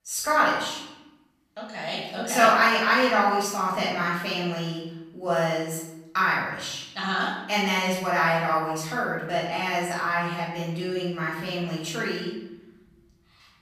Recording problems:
off-mic speech; far
room echo; noticeable; dies away in 0.8 s

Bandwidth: 14.5 kHz